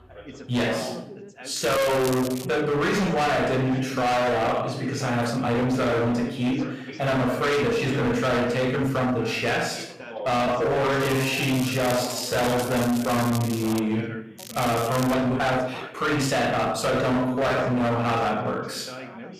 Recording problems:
distortion; heavy; 27% of the sound clipped
off-mic speech; far
room echo; noticeable; dies away in 0.6 s
background chatter; noticeable; throughout; 3 voices, 15 dB below the speech
crackling; noticeable; at 1.5 s, from 11 to 14 s and at 14 s; 15 dB below the speech
uneven, jittery; strongly; from 1.5 to 18 s

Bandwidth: 14.5 kHz